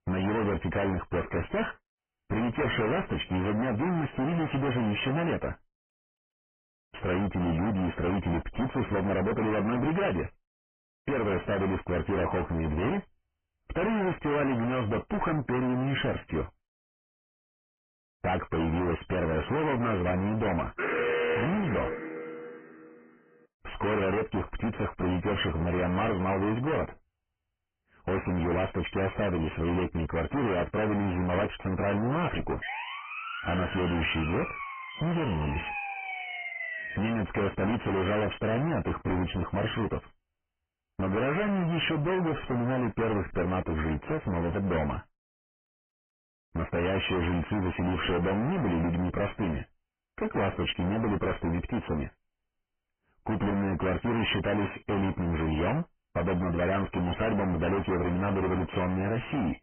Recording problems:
distortion; heavy; 36% of the sound clipped
garbled, watery; badly
high frequencies cut off; severe; nothing above 3 kHz
alarm; loud; from 21 to 23 s; peak 2 dB above the speech
siren; noticeable; from 33 to 37 s; peak 4 dB below the speech

